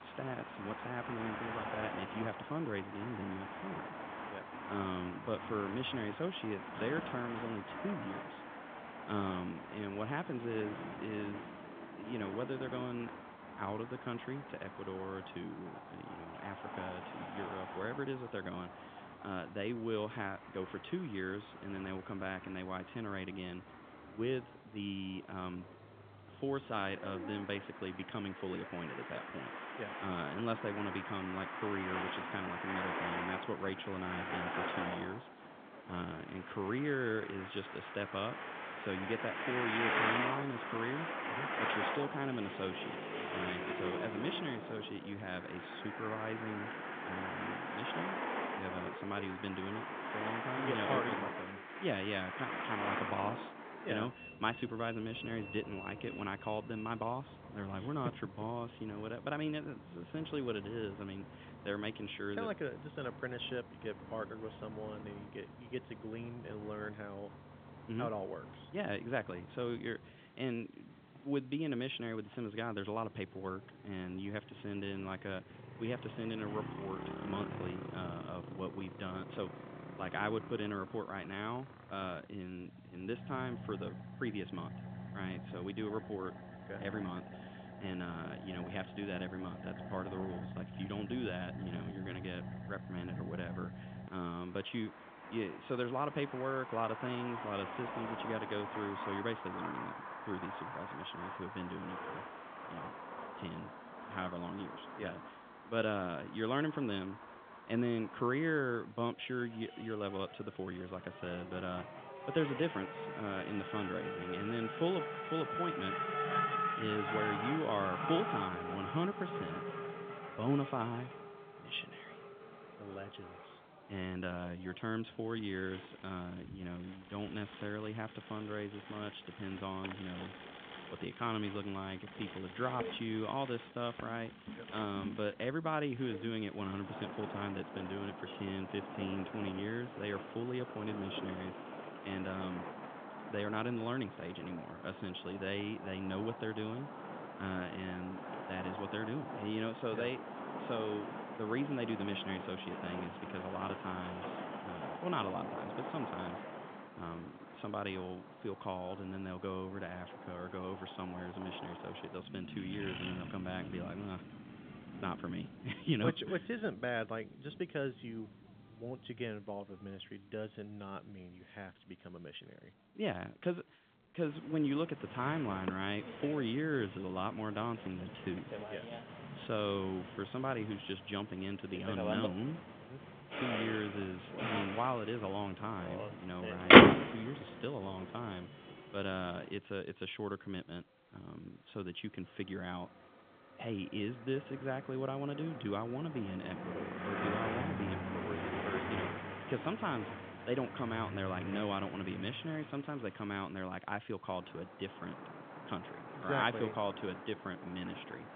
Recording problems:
phone-call audio; nothing above 3.5 kHz
traffic noise; very loud; throughout; 1 dB above the speech

